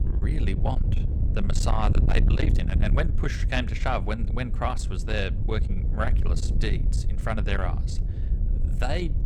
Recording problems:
distortion; heavy; 8 dB below the speech
wind noise on the microphone; heavy; 9 dB below the speech

